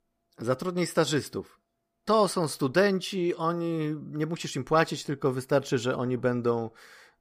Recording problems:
none

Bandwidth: 15 kHz